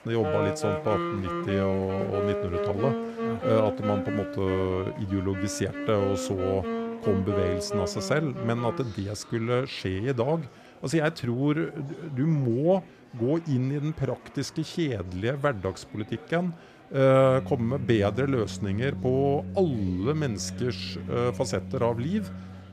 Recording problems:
background music; loud; throughout; 6 dB below the speech
murmuring crowd; faint; throughout; 20 dB below the speech

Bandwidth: 14.5 kHz